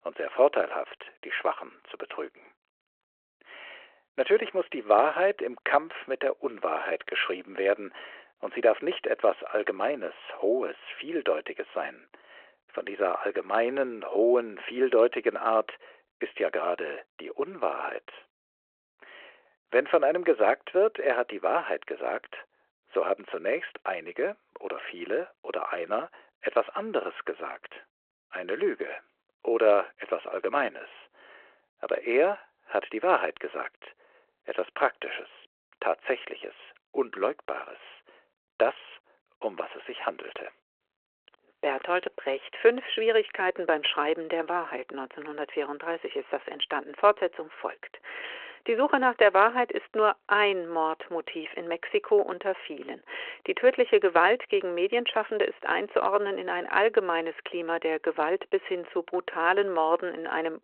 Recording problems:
phone-call audio

